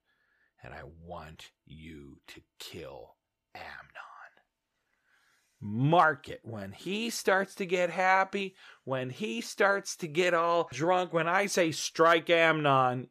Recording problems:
none

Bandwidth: 14.5 kHz